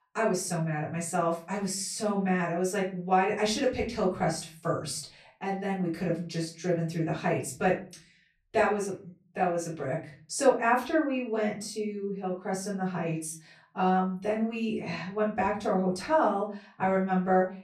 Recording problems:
off-mic speech; far
room echo; slight; dies away in 0.4 s

